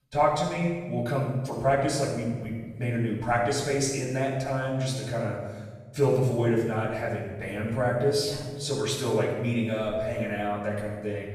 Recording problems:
off-mic speech; far
room echo; noticeable; dies away in 1.3 s

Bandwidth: 14 kHz